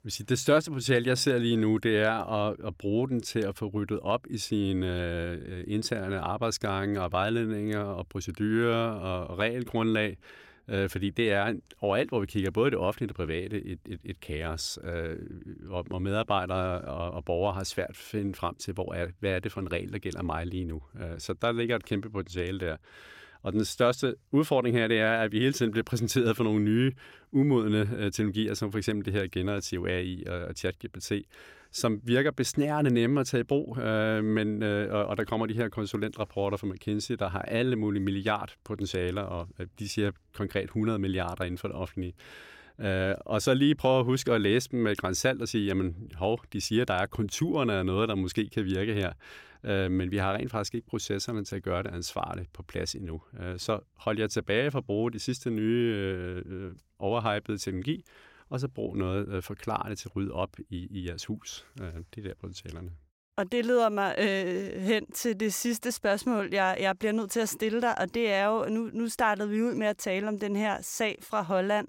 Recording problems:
none

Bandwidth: 16.5 kHz